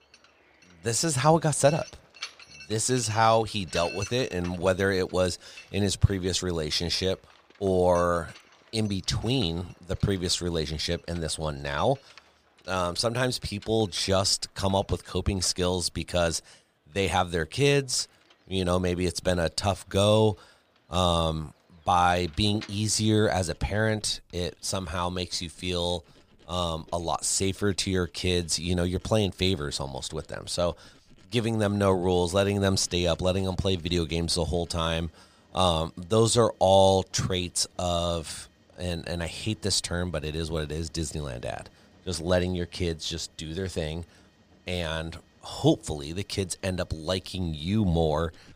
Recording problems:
machinery noise; faint; throughout; 25 dB below the speech

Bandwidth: 15 kHz